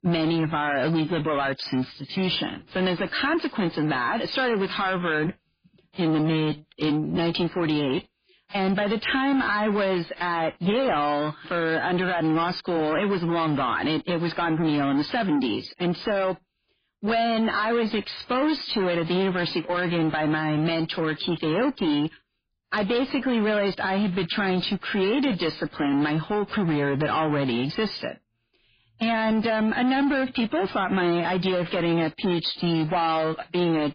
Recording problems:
garbled, watery; badly
distortion; slight; 10 dB below the speech

